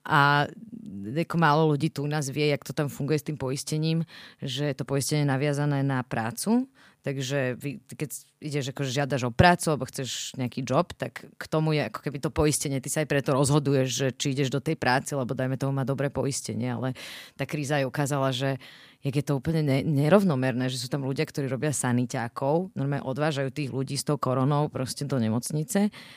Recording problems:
none

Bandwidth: 15 kHz